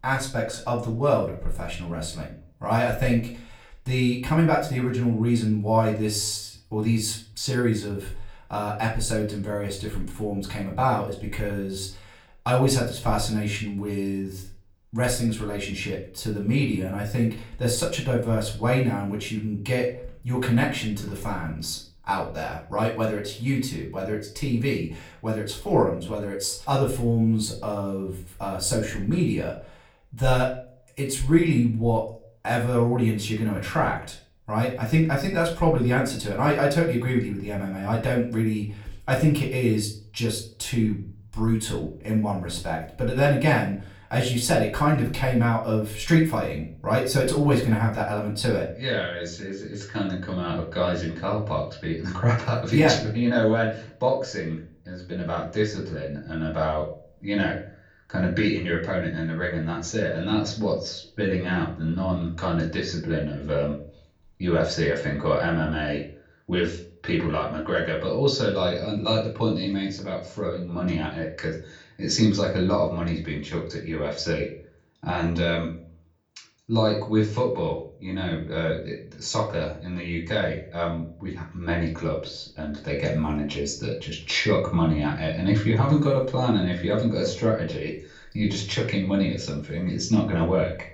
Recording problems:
off-mic speech; far
room echo; slight; dies away in 0.4 s

